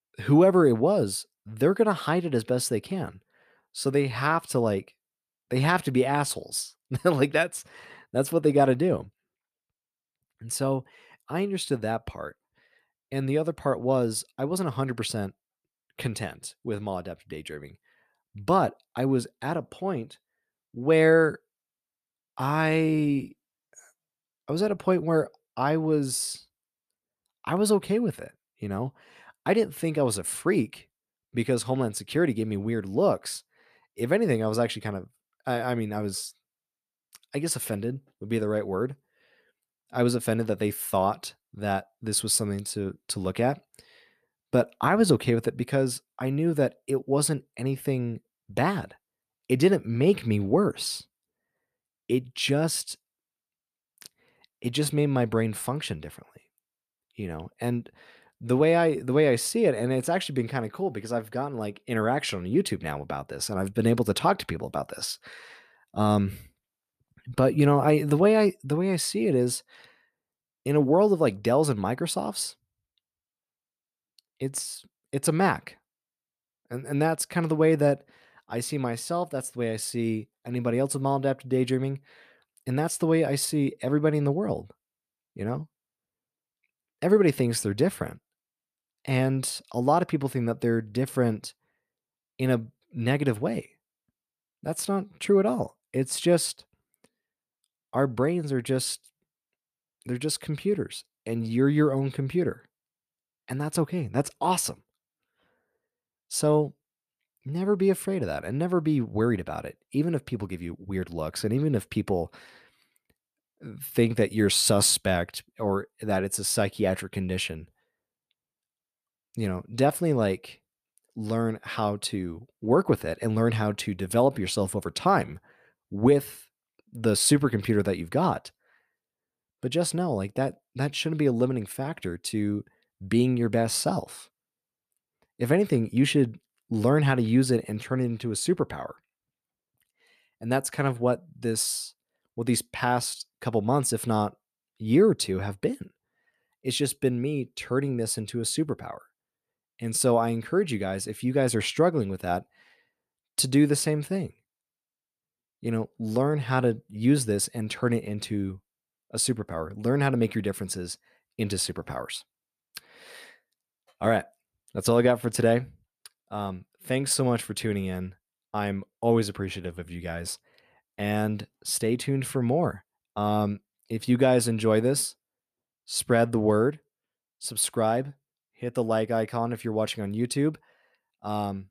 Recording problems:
none

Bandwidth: 14.5 kHz